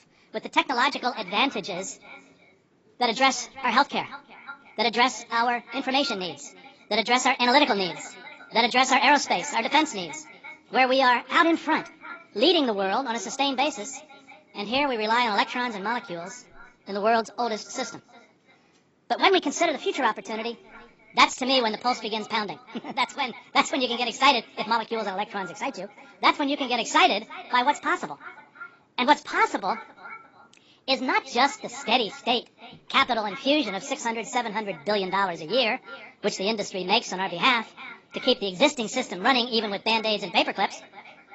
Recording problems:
garbled, watery; badly; nothing above 7.5 kHz
wrong speed and pitch; too fast and too high; 1.5 times normal speed
echo of what is said; faint; throughout; 350 ms later, 20 dB below the speech

